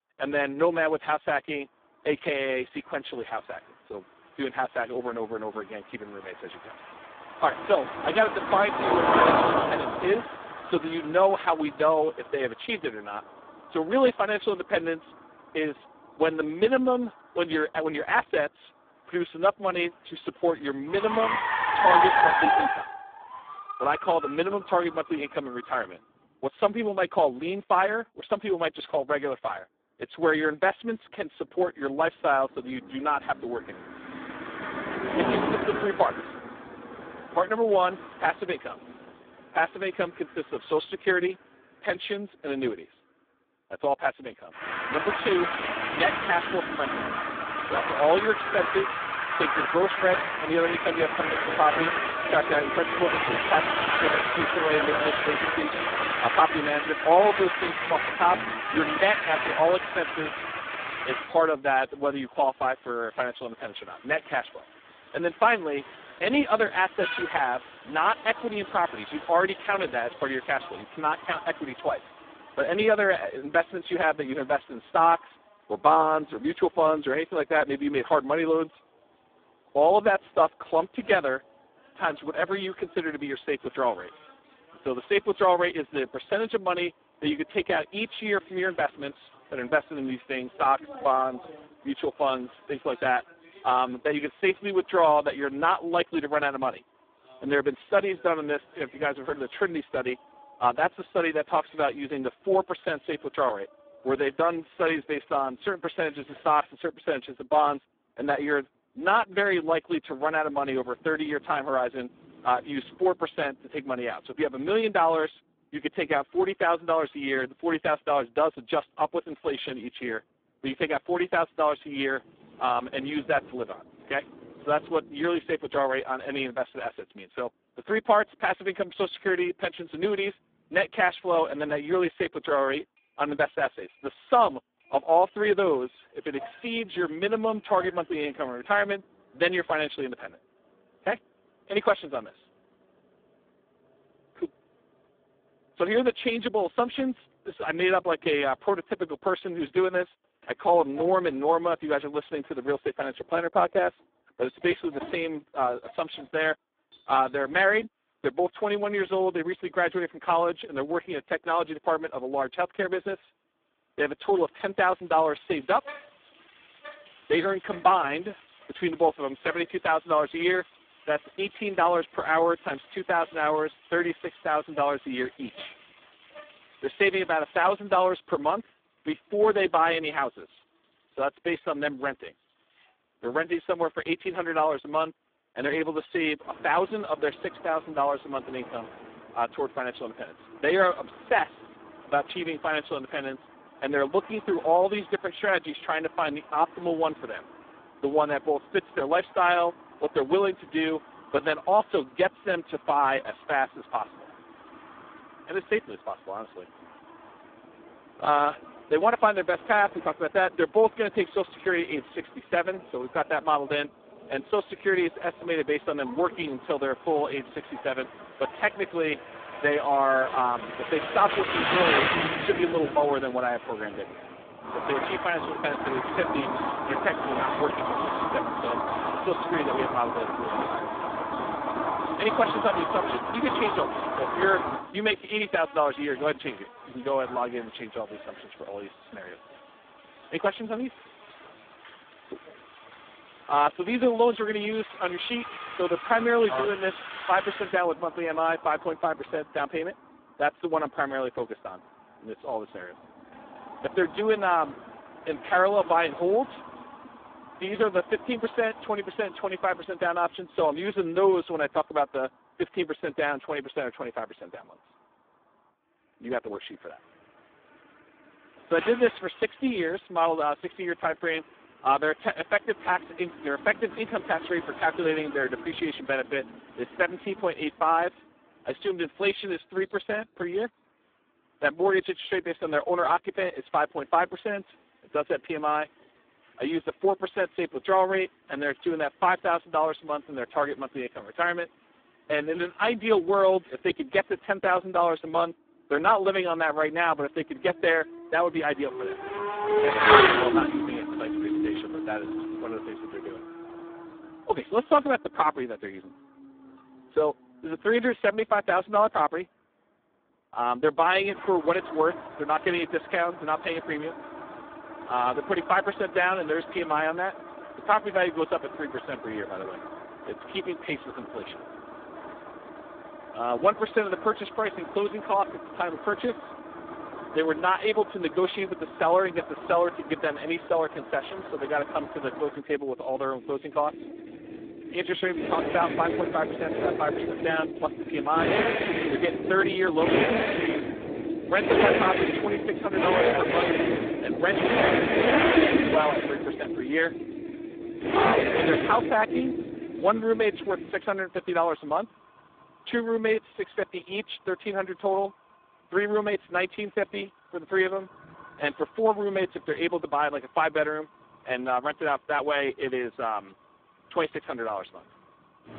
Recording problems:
phone-call audio; poor line
traffic noise; loud; throughout; 2 dB below the speech

